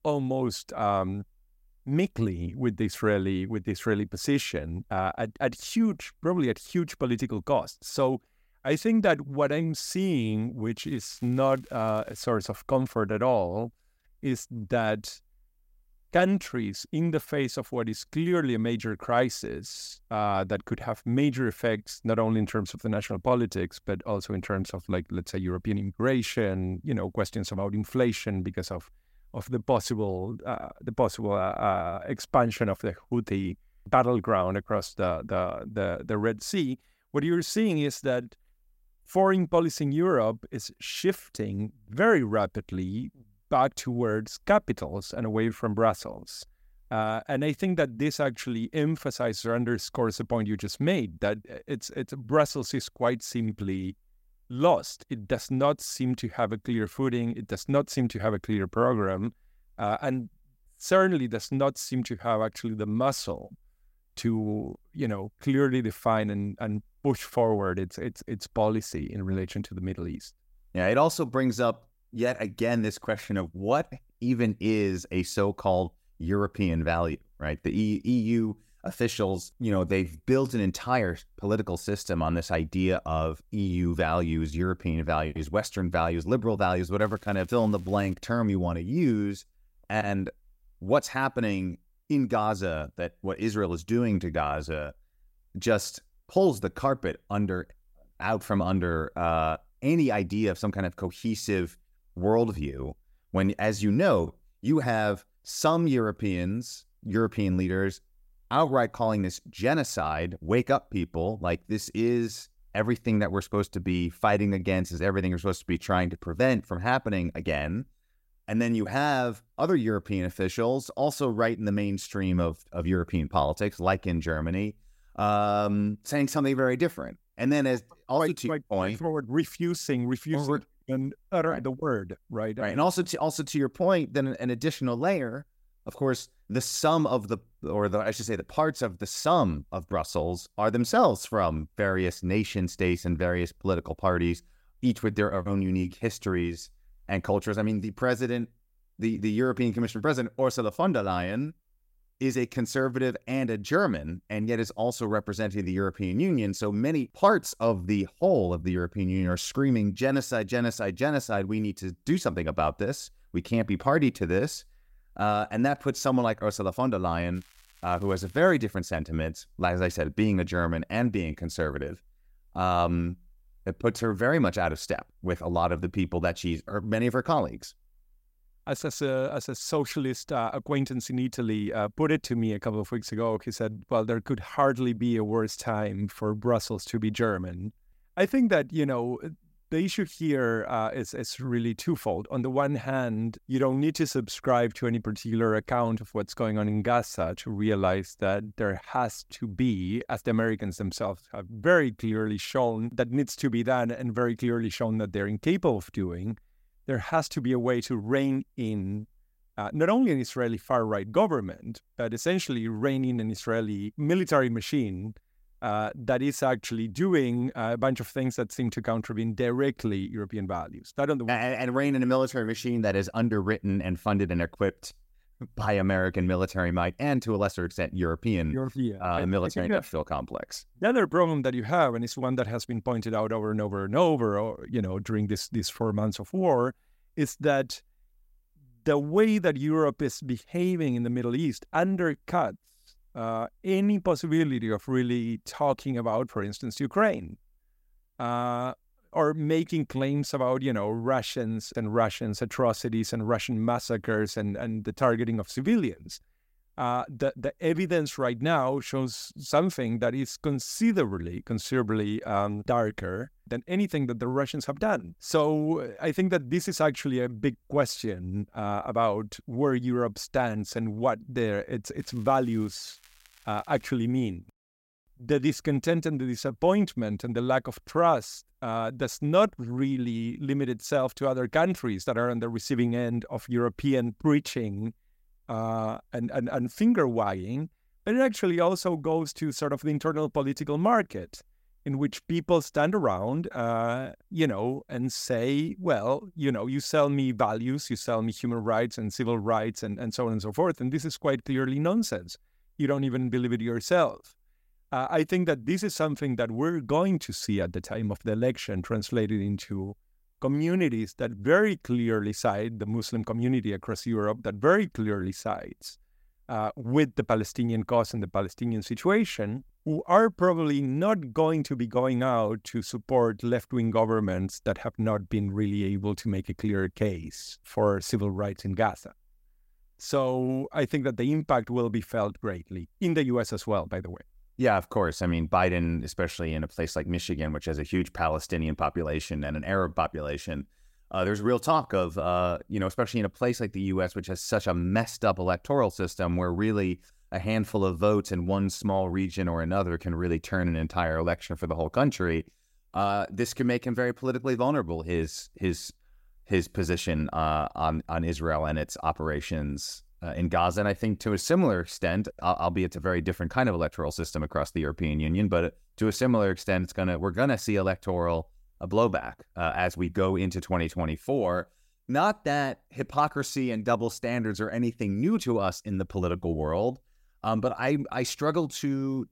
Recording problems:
crackling; faint; 4 times, first at 11 s; 30 dB below the speech

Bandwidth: 16 kHz